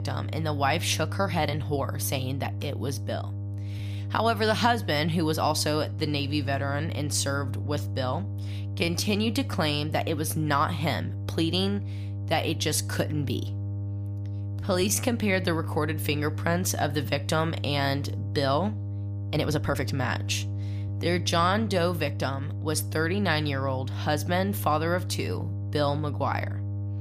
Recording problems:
electrical hum; noticeable; throughout; 50 Hz, 15 dB below the speech
uneven, jittery; strongly; from 1 to 22 s

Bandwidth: 15 kHz